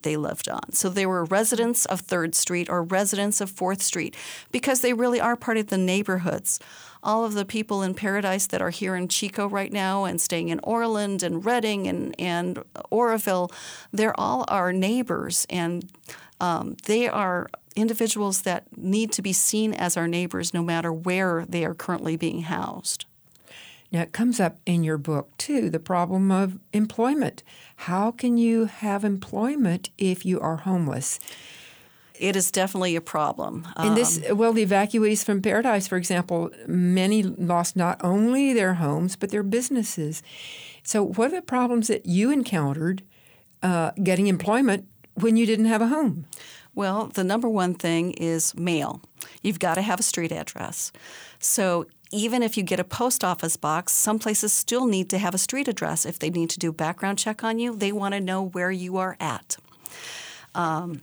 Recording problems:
none

